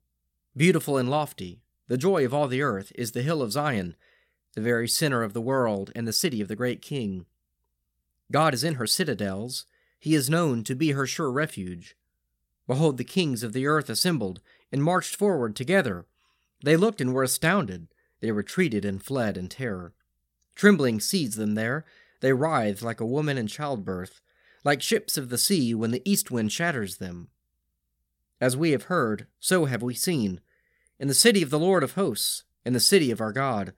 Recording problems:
uneven, jittery; slightly; from 4.5 to 9 s

